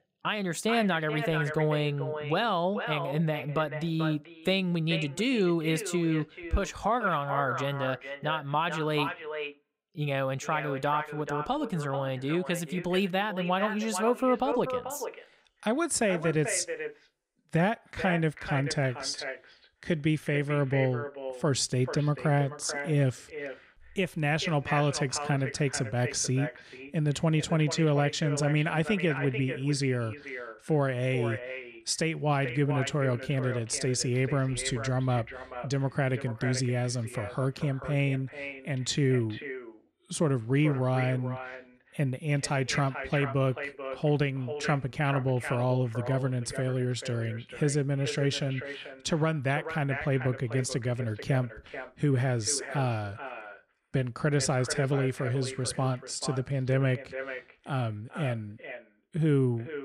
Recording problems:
echo of what is said; strong; throughout; 440 ms later, 10 dB below the speech

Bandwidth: 15.5 kHz